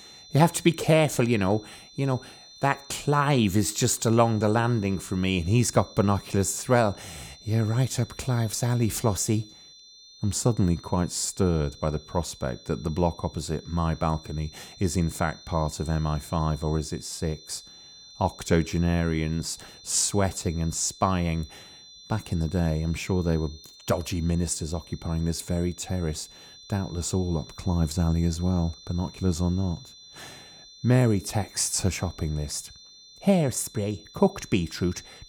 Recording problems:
high-pitched whine; faint; throughout; 4 kHz, 20 dB below the speech

